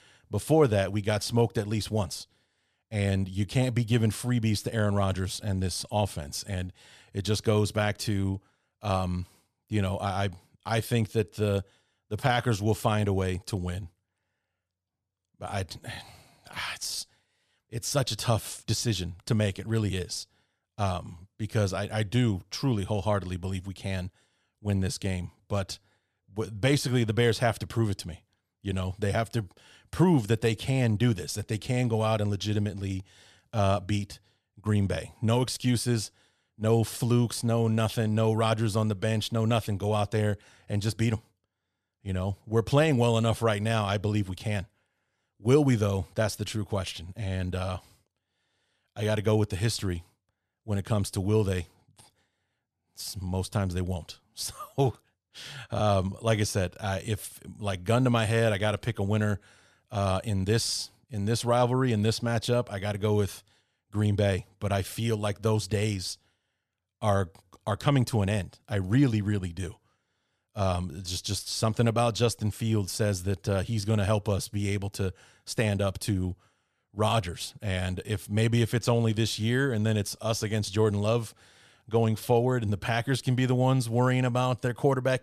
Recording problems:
none

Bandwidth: 14.5 kHz